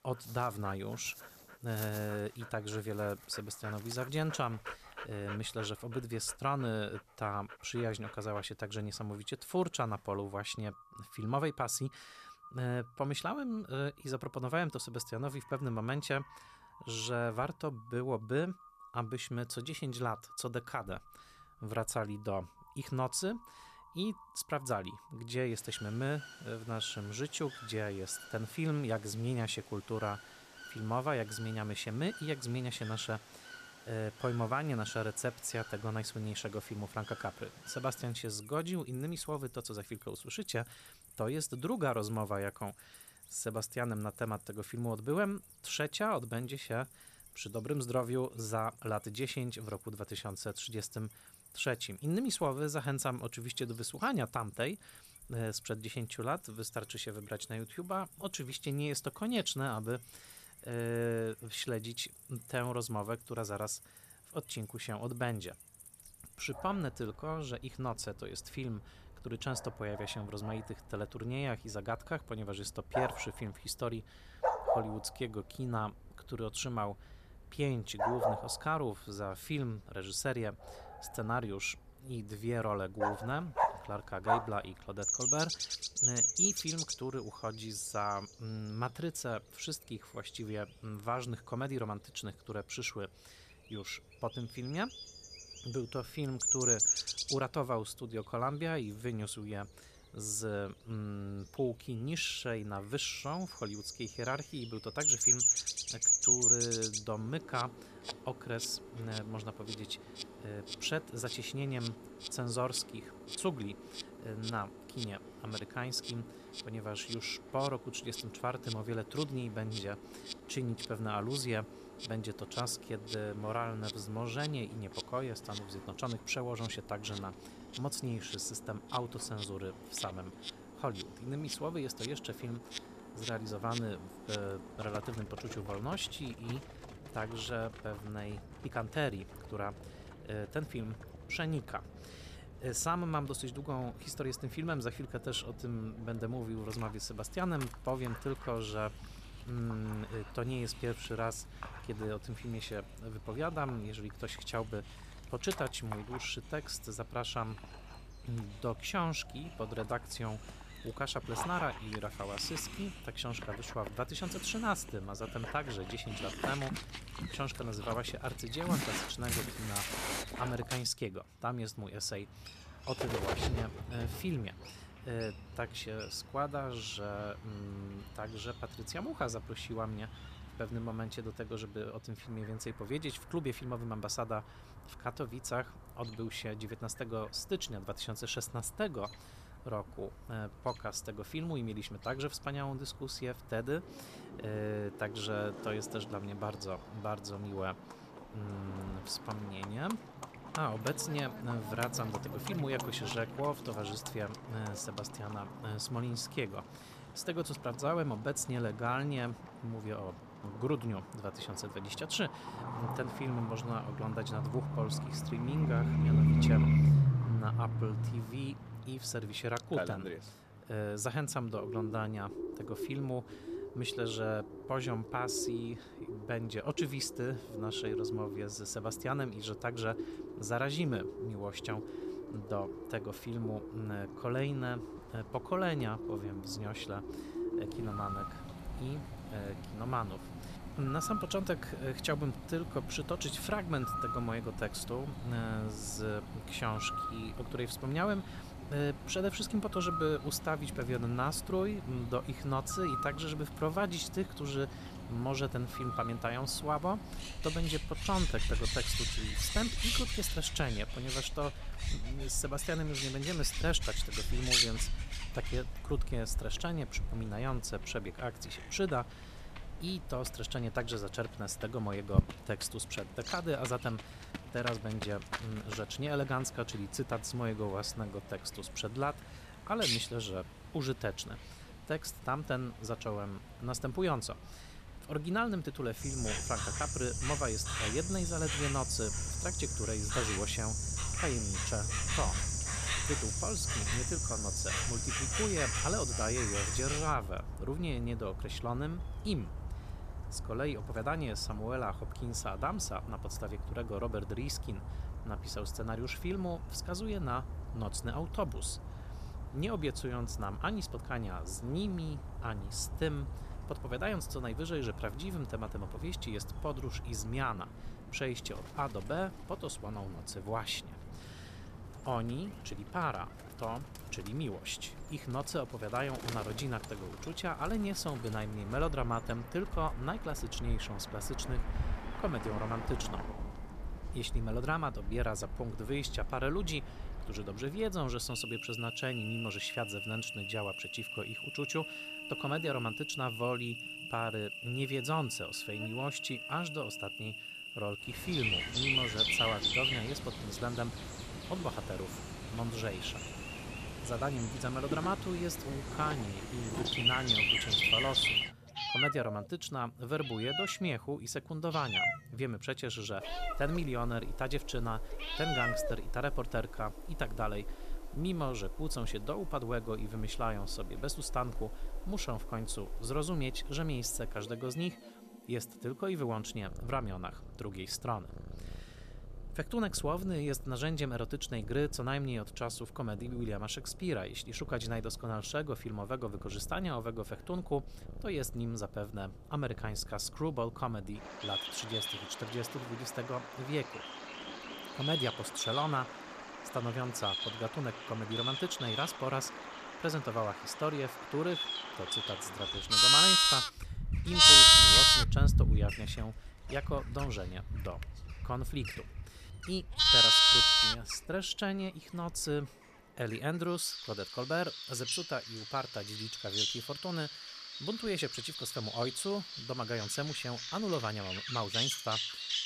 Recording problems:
animal sounds; very loud; throughout; 4 dB above the speech

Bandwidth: 14.5 kHz